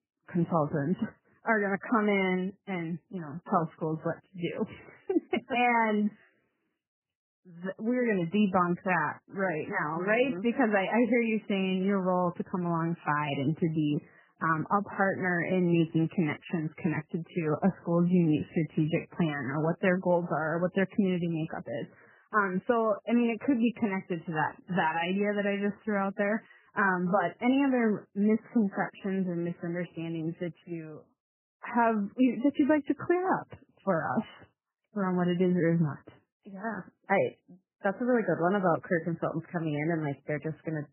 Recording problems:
garbled, watery; badly; nothing above 3 kHz

